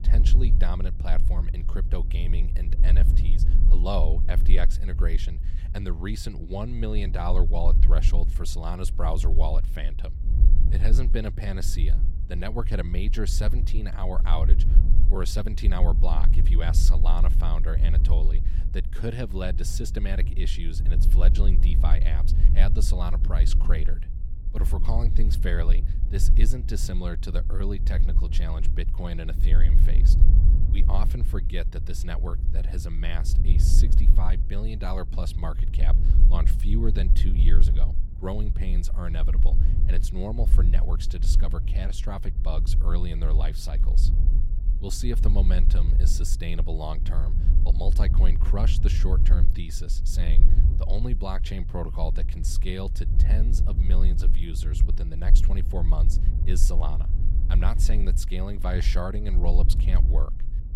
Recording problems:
low rumble; loud; throughout; 8 dB below the speech

